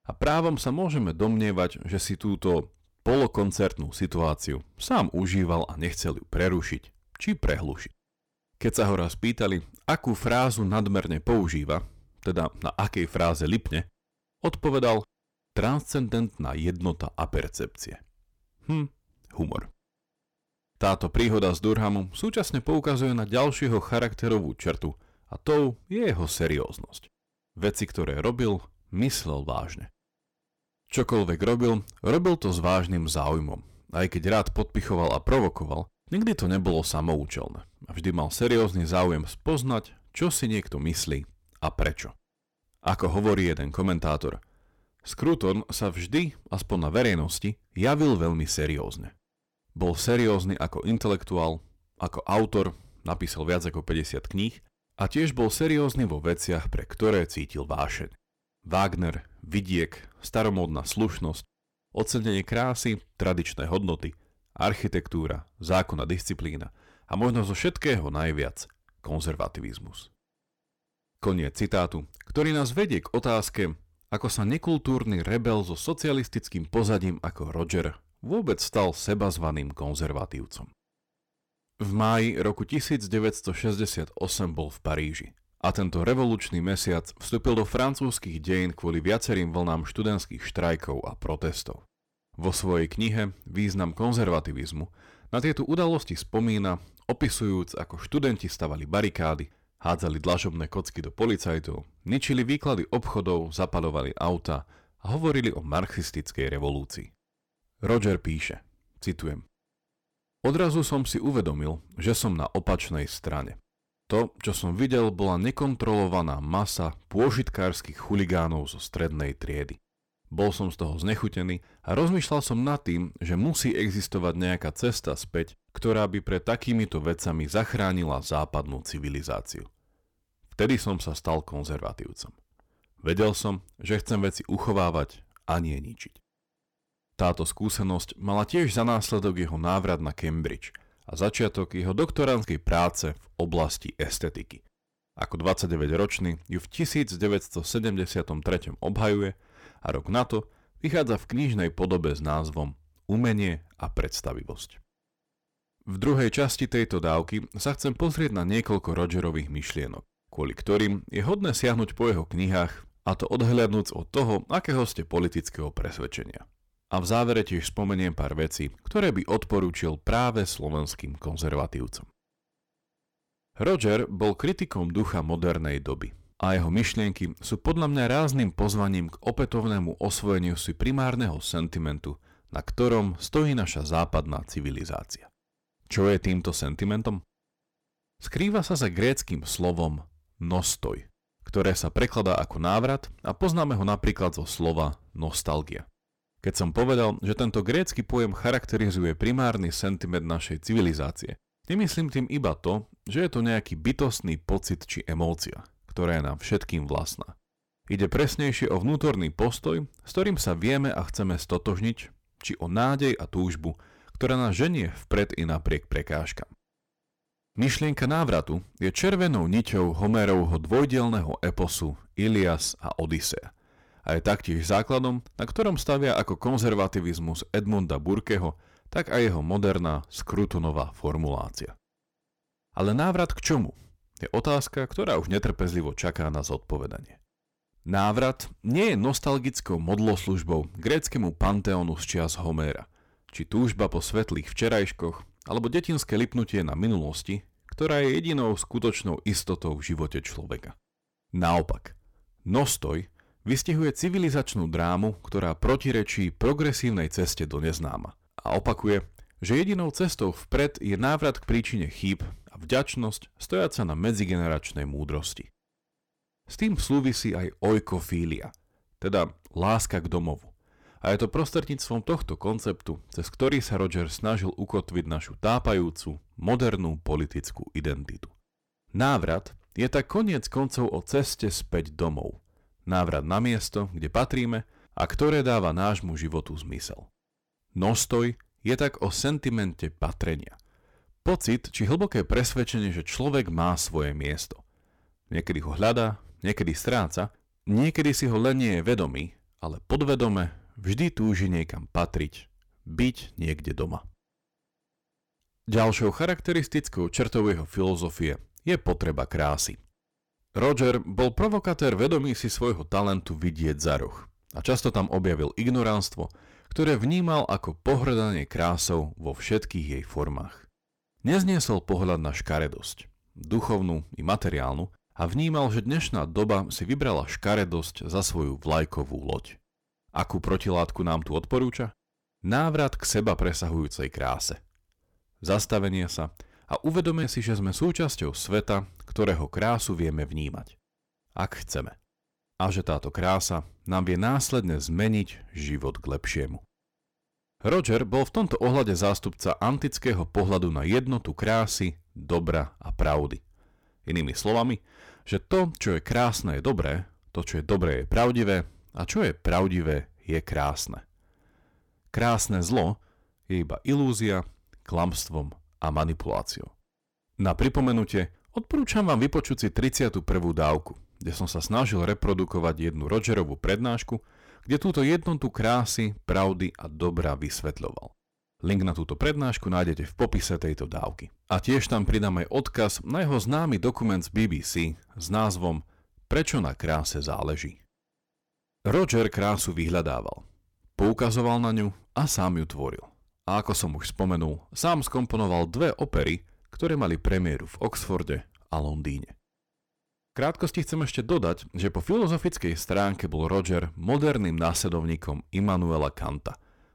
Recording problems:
distortion; slight; 5% of the sound clipped

